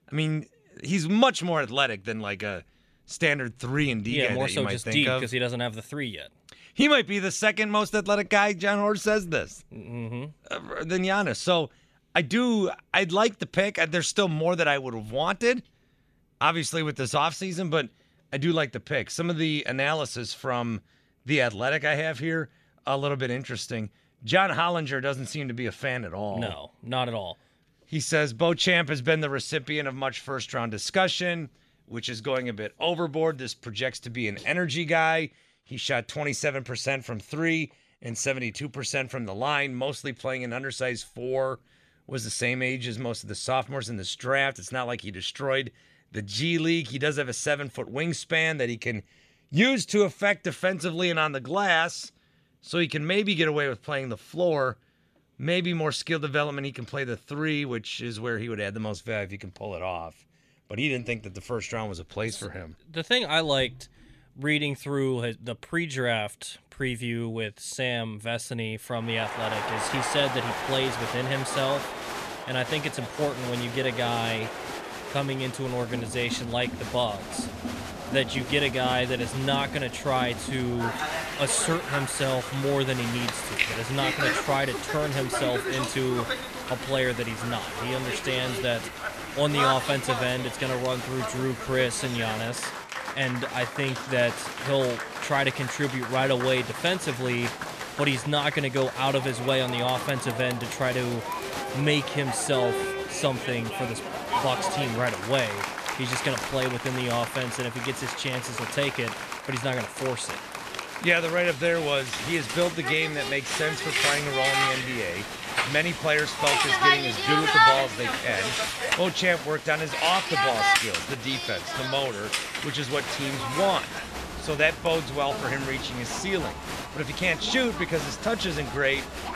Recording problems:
crowd noise; loud; from 1:09 on; 3 dB below the speech

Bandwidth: 14.5 kHz